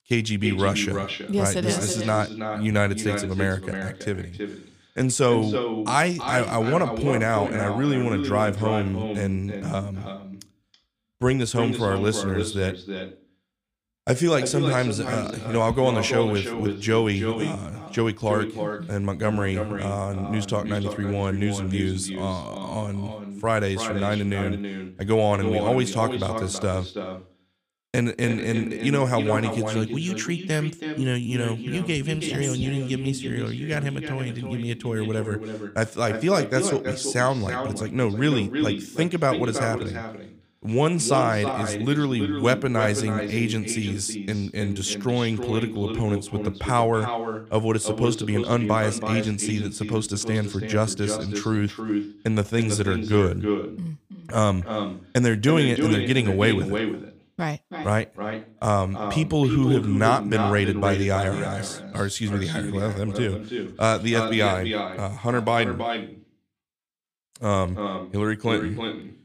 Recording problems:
echo of what is said; strong; throughout; 330 ms later, 6 dB below the speech

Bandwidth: 15.5 kHz